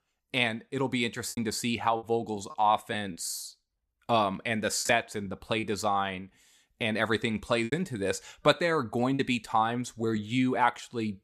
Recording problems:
choppy; very; from 1.5 to 5.5 s and from 7.5 to 9 s; 7% of the speech affected

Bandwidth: 13.5 kHz